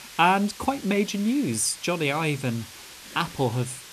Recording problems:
hiss; noticeable; throughout; 15 dB below the speech

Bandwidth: 14 kHz